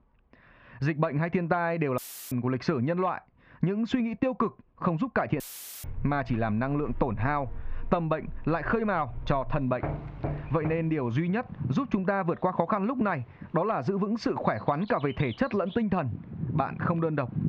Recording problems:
muffled; very; fading above 2.5 kHz
squashed, flat; somewhat, background pumping
animal sounds; noticeable; from 6 s on; 15 dB below the speech
audio cutting out; filled with static; at 2 s and at 5.5 s
door banging; noticeable; from 10 to 11 s; peak 6 dB below the speech

